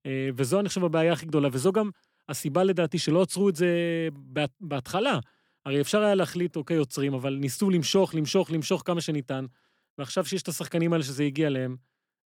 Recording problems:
none

